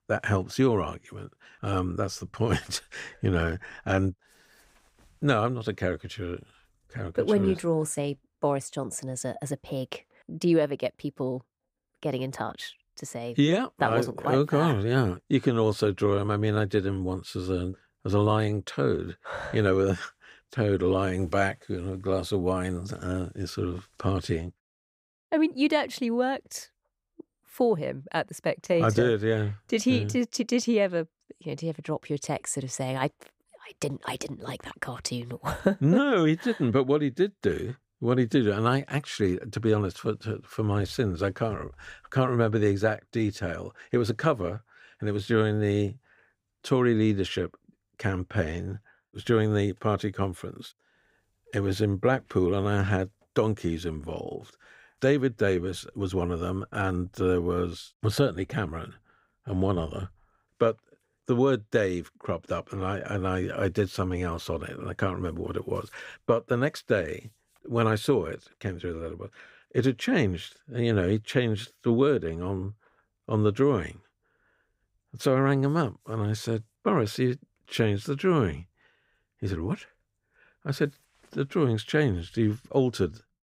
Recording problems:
none

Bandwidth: 15.5 kHz